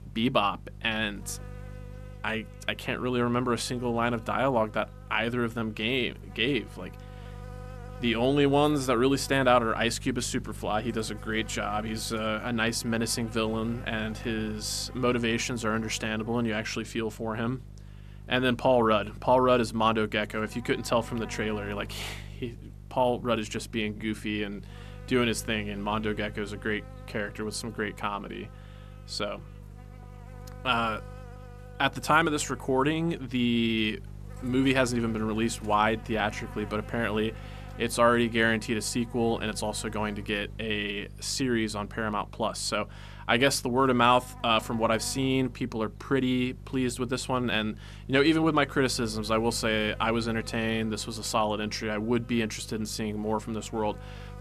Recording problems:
electrical hum; faint; throughout; 50 Hz, 20 dB below the speech

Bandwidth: 14 kHz